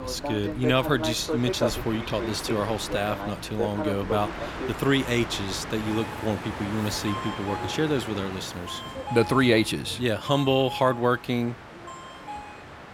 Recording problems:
train or aircraft noise; loud; throughout; 7 dB below the speech

